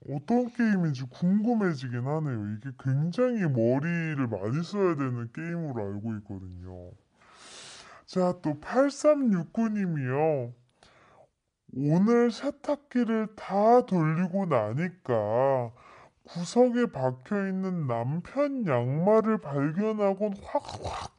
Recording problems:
wrong speed and pitch; too slow and too low; 0.6 times normal speed

